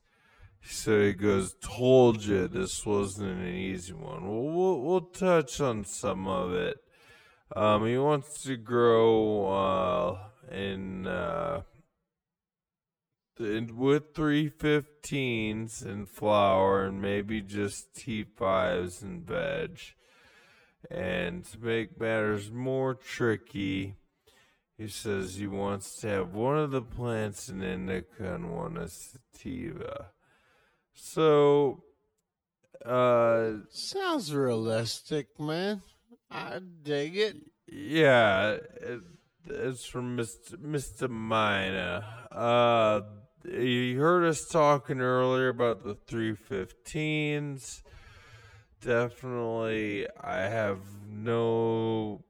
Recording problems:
wrong speed, natural pitch; too slow; 0.5 times normal speed

